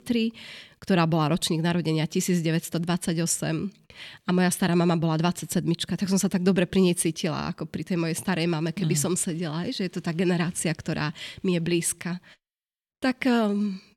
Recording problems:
none

